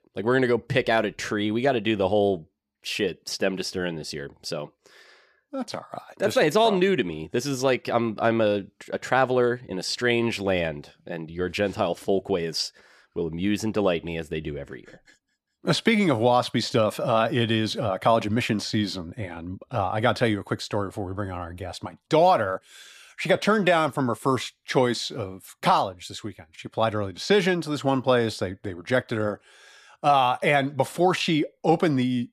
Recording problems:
none

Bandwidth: 14.5 kHz